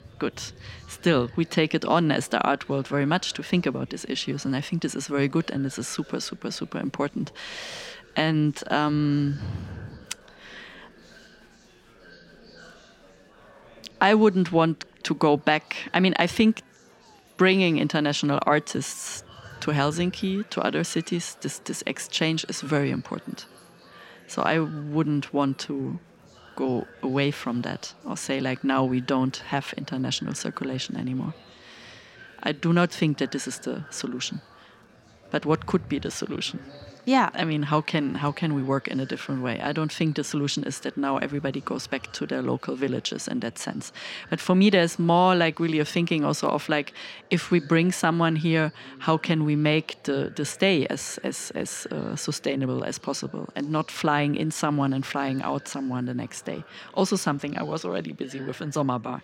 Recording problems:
murmuring crowd; faint; throughout; 25 dB below the speech

